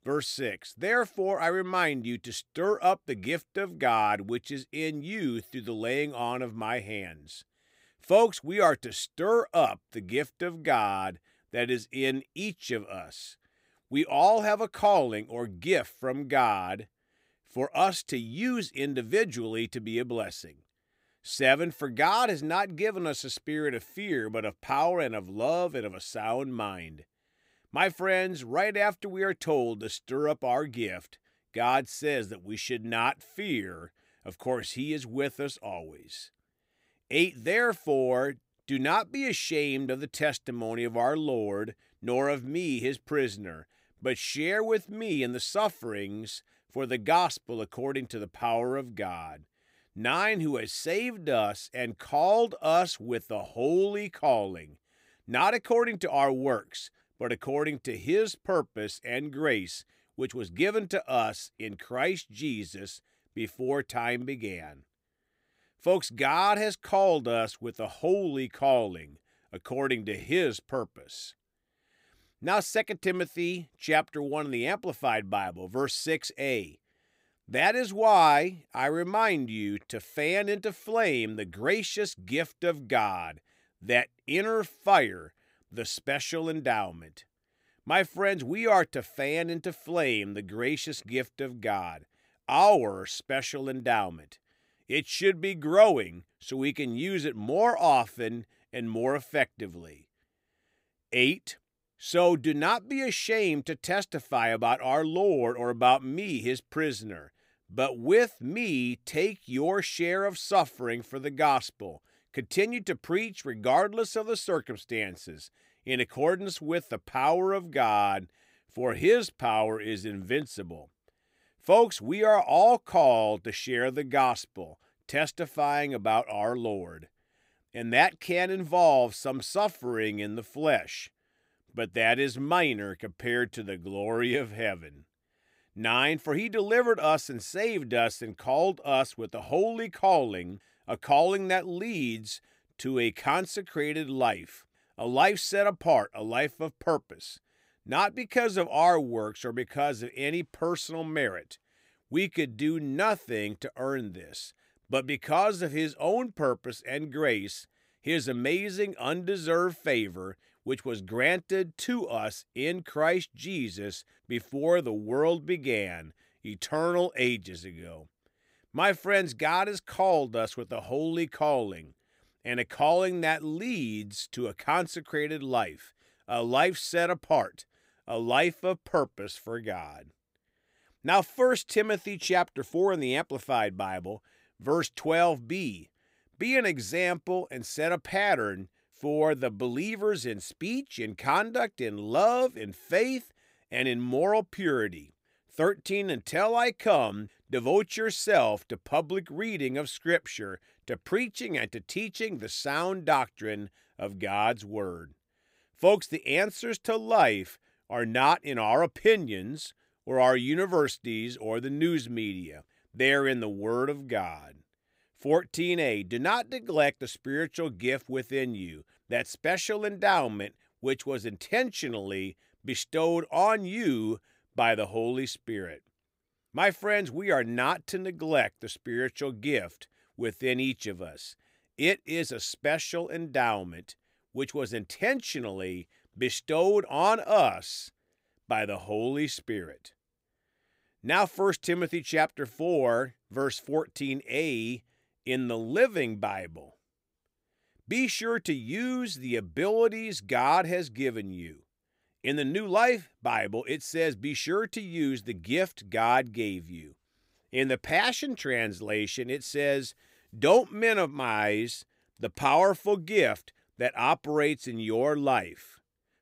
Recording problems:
none

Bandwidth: 15.5 kHz